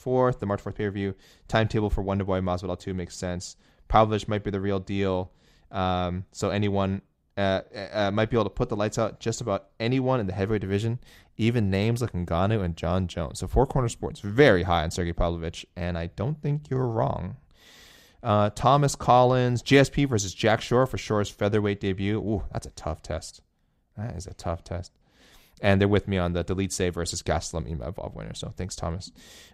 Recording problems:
none

